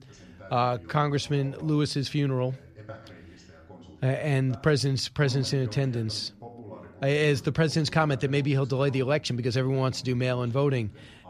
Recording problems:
voice in the background; faint; throughout; 20 dB below the speech

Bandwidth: 14.5 kHz